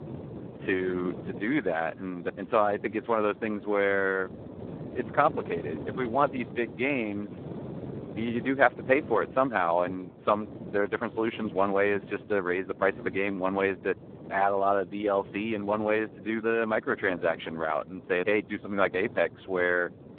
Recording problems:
phone-call audio; poor line; nothing above 3.5 kHz
wind noise on the microphone; occasional gusts; 20 dB below the speech

